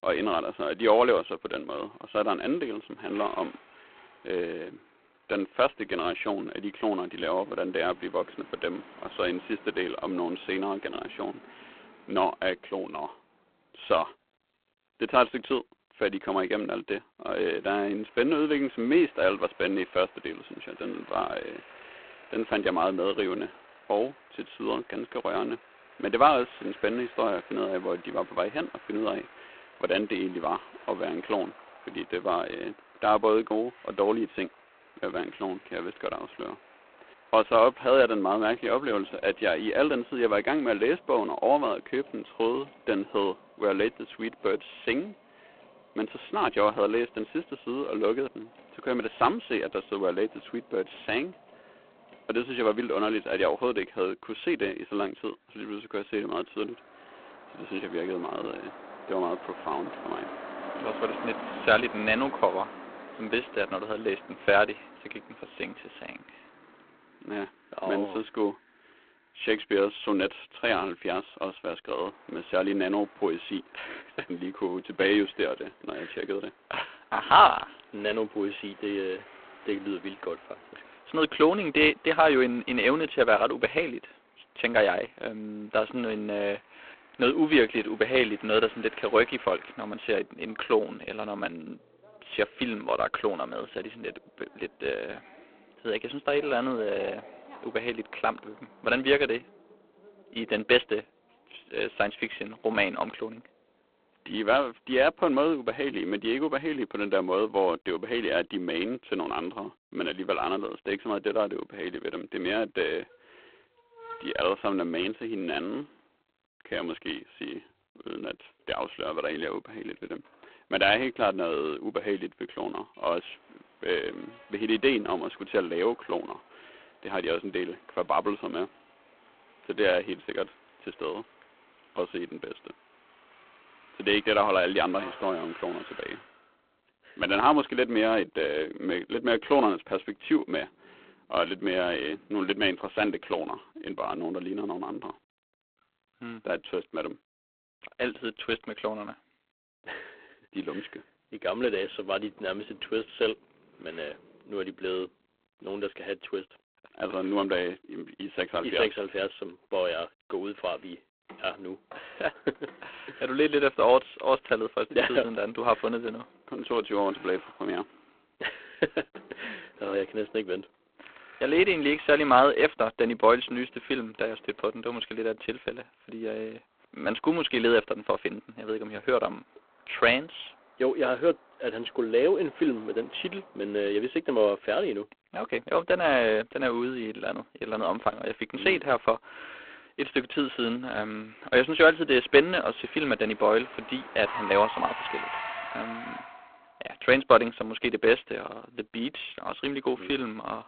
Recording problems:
phone-call audio; poor line
traffic noise; noticeable; throughout; 20 dB below the speech

